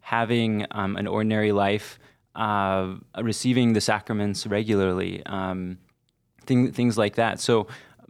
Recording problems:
none

